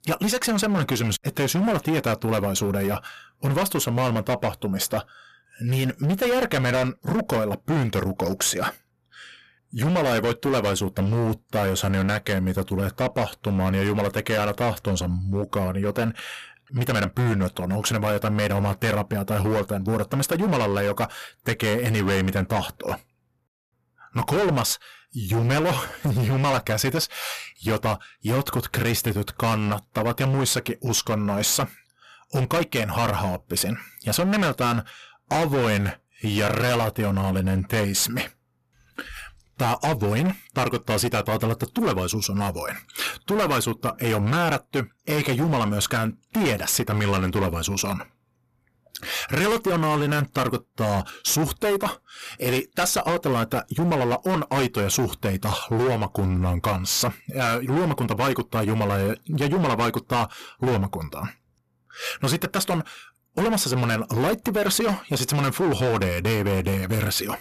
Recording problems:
distortion; heavy; 18% of the sound clipped

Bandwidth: 14.5 kHz